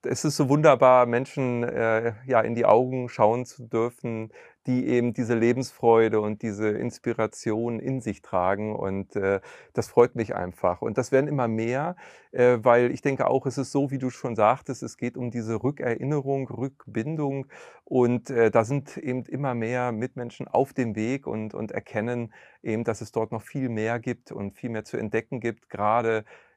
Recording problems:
none

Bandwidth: 15 kHz